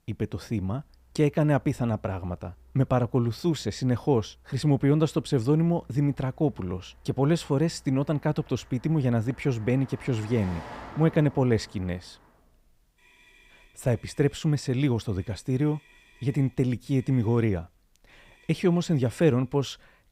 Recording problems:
traffic noise; faint; throughout; 25 dB below the speech

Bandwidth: 15.5 kHz